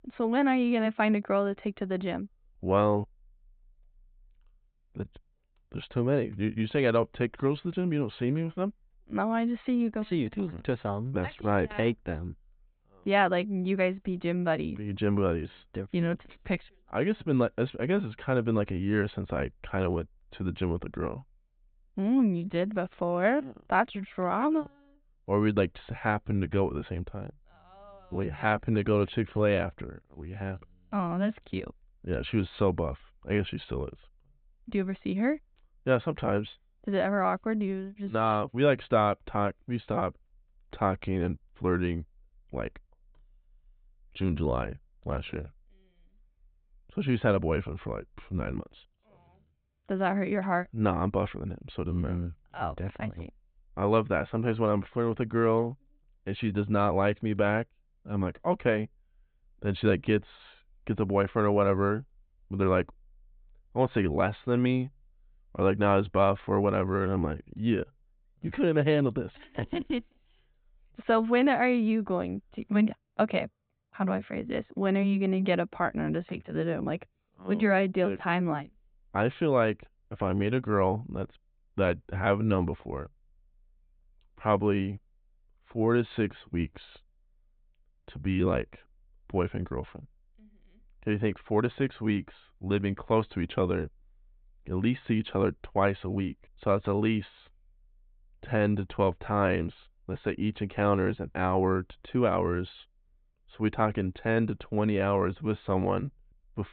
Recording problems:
high frequencies cut off; severe; nothing above 4 kHz

